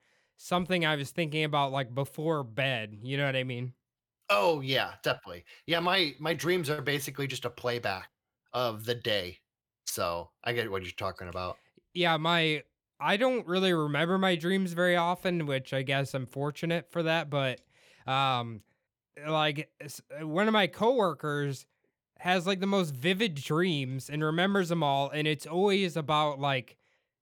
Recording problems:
none

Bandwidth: 18.5 kHz